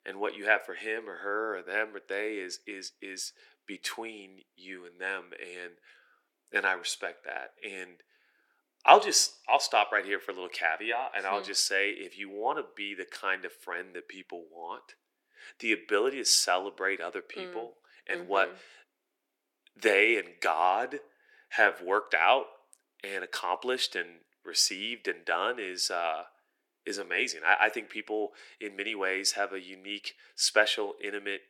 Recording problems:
thin; very; fading below 300 Hz

